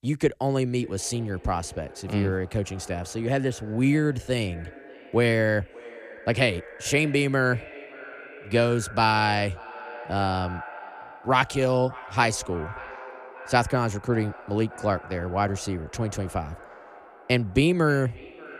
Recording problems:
echo of what is said; noticeable; throughout; 580 ms later, 15 dB below the speech

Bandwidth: 14.5 kHz